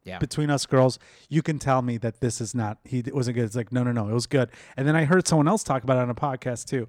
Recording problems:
none

